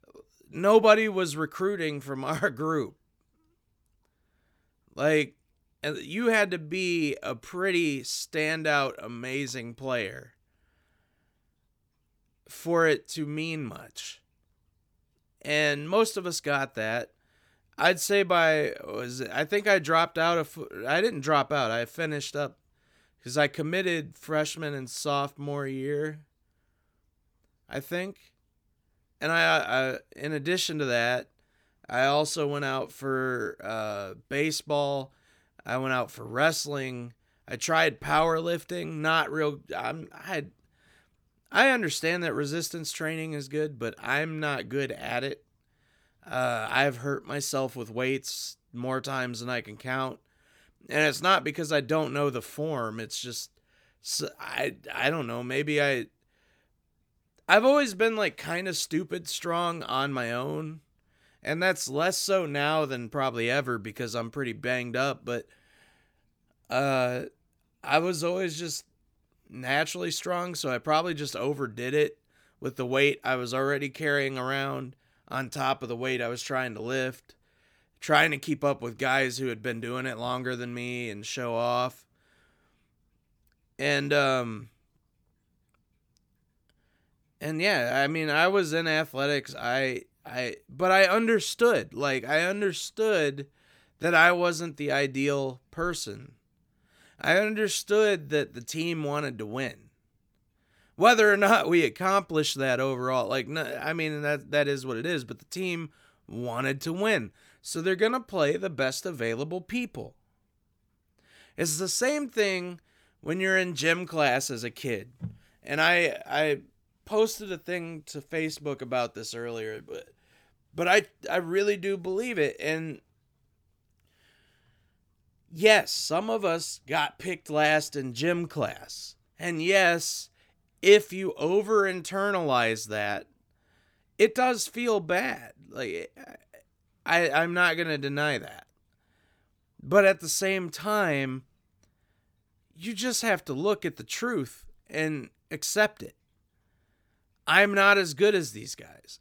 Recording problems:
none

